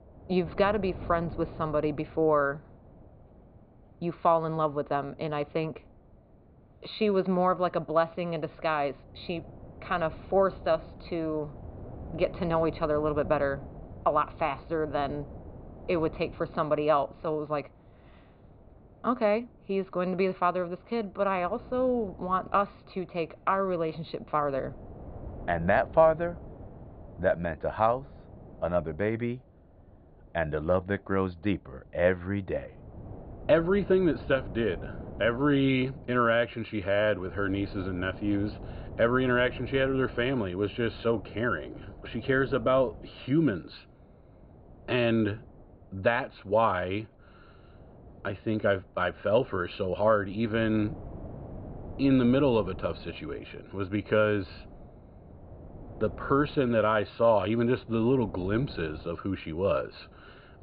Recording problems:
high frequencies cut off; severe; nothing above 4.5 kHz
muffled; very slightly; fading above 2.5 kHz
wind noise on the microphone; occasional gusts; 25 dB below the speech

